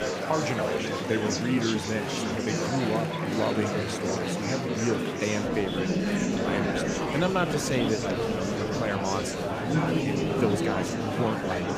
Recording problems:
murmuring crowd; very loud; throughout; 2 dB above the speech

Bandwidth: 15 kHz